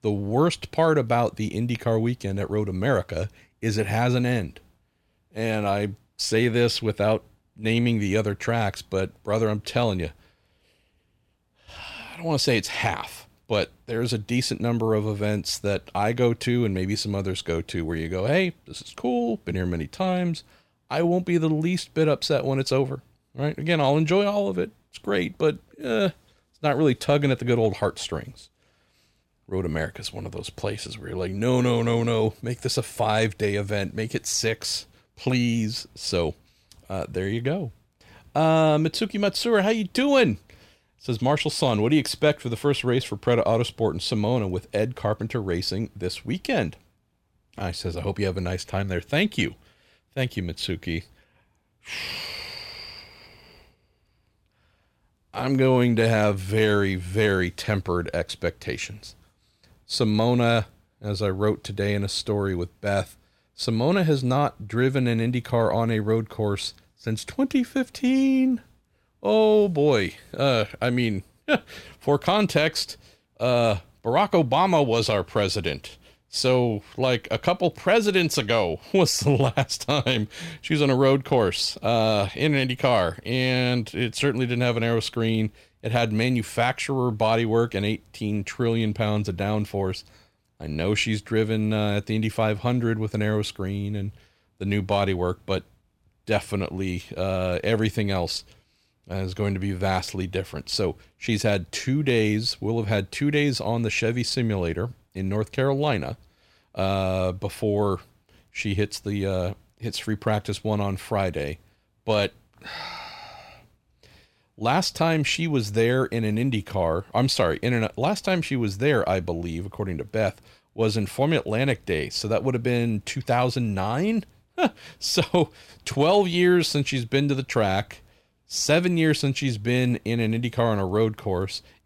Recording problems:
none

